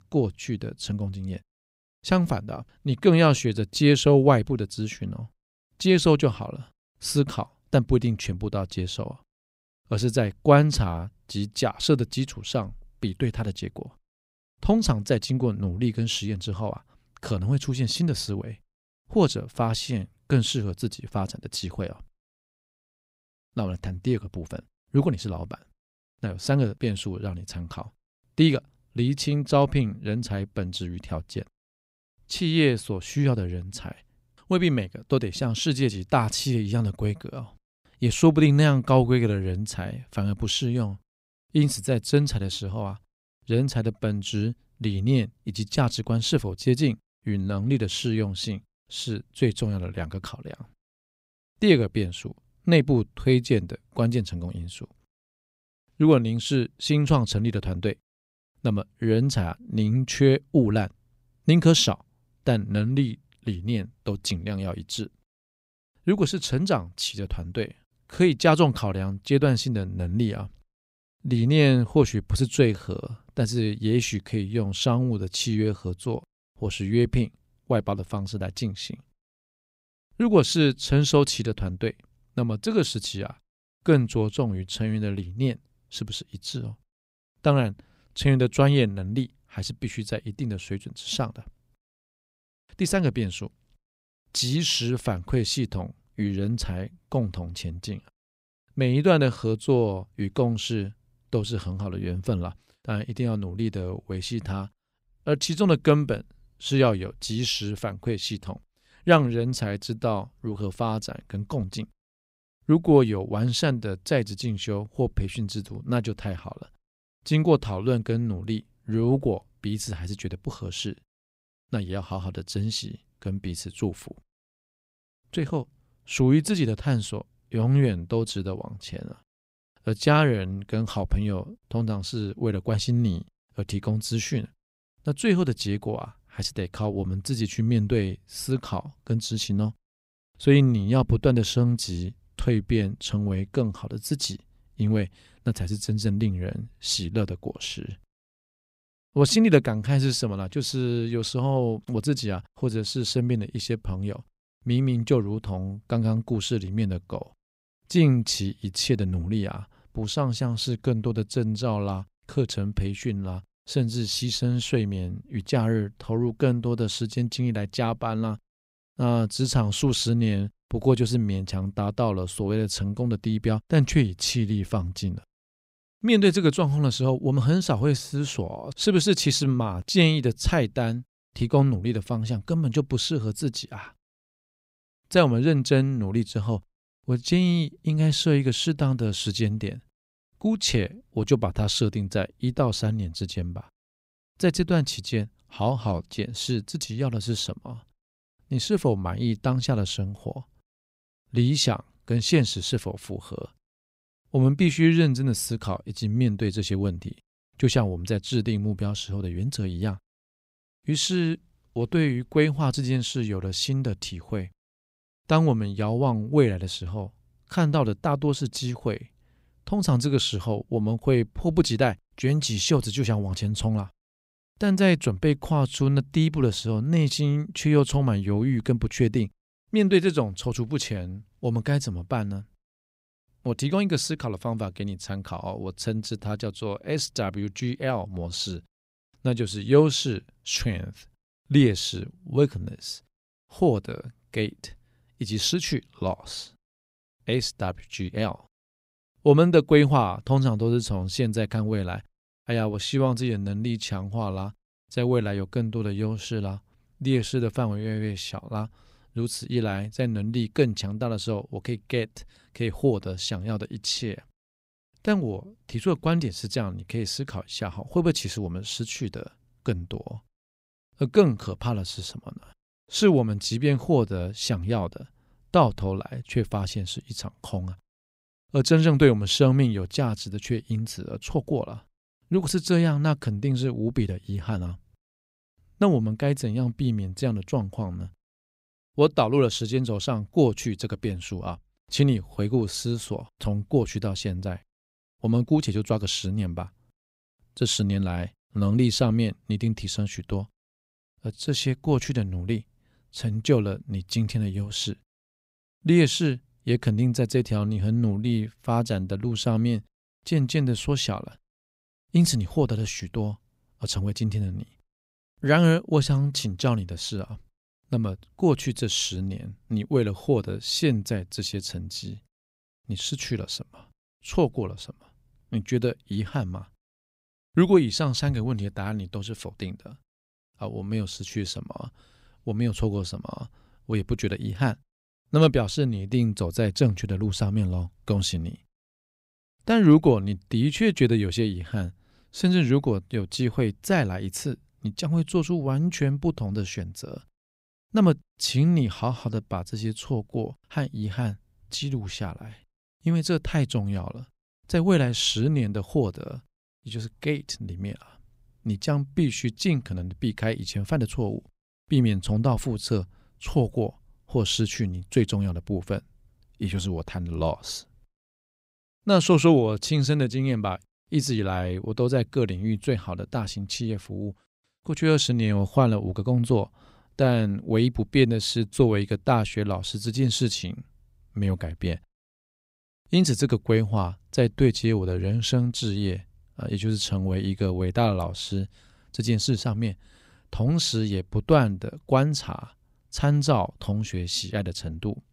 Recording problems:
none

